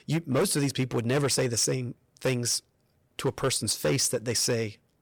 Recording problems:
distortion; slight; 8% of the sound clipped

